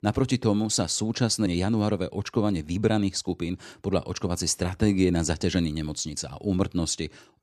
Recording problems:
none

